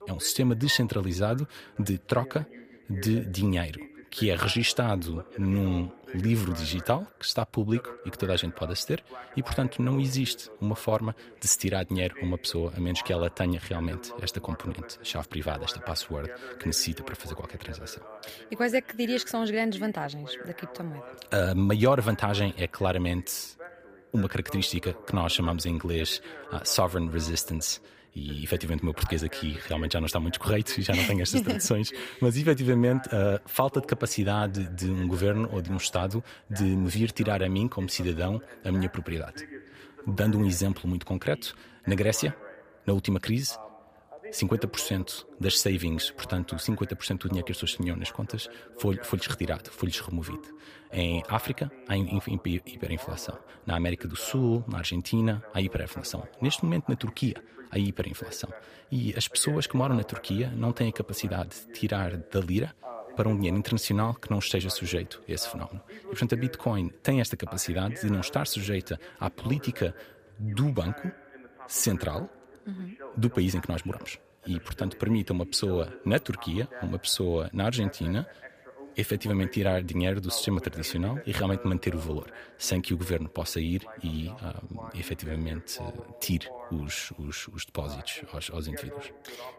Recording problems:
voice in the background; noticeable; throughout; 15 dB below the speech

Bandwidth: 15 kHz